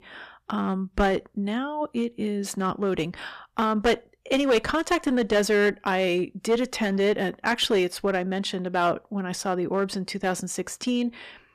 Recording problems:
distortion; slight; 5% of the sound clipped

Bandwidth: 14.5 kHz